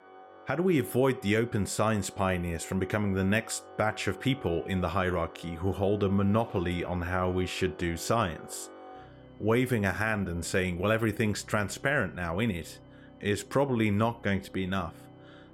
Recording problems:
background music; noticeable; throughout; 20 dB below the speech

